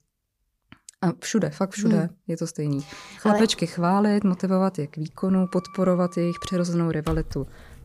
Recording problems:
household noises; noticeable; from 3.5 s on; 20 dB below the speech

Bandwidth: 15 kHz